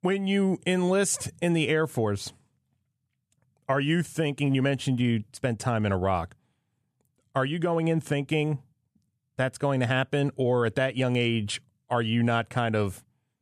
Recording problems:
none

